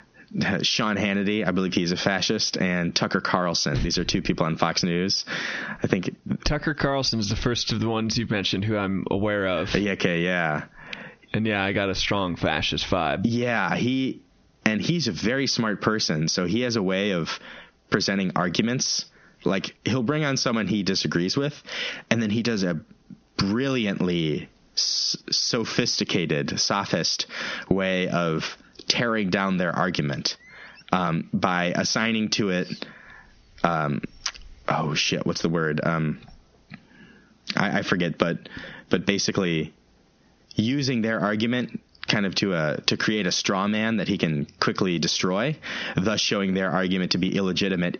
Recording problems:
squashed, flat; heavily
high frequencies cut off; noticeable; nothing above 6.5 kHz

